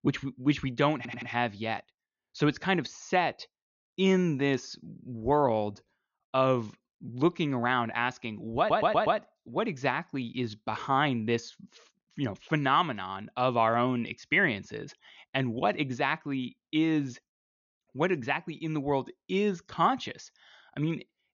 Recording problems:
high frequencies cut off; noticeable; nothing above 6.5 kHz
audio stuttering; at 1 s and at 8.5 s

